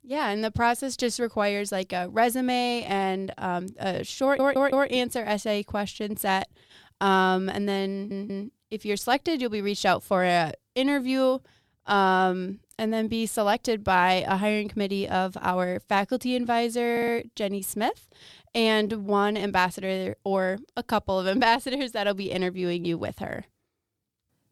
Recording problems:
audio stuttering; at 4 s, at 8 s and at 17 s

